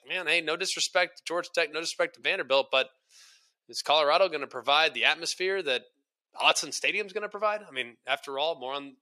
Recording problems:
thin; somewhat; fading below 500 Hz

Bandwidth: 14.5 kHz